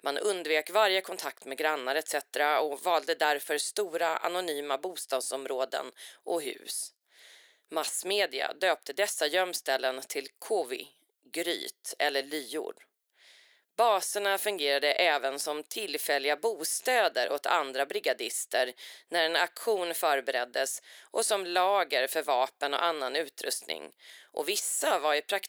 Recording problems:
thin; very; fading below 400 Hz

